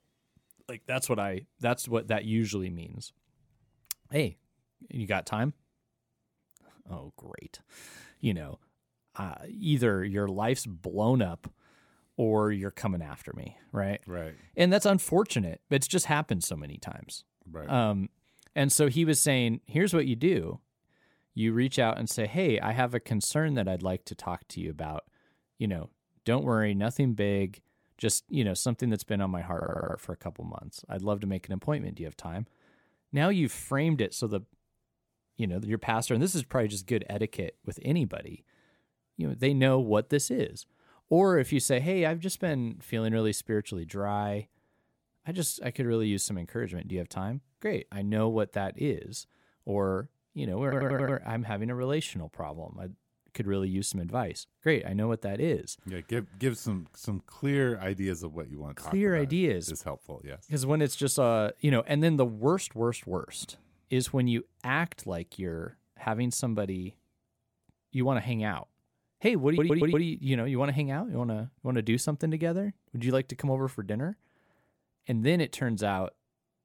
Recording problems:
audio stuttering; at 30 s, at 51 s and at 1:09

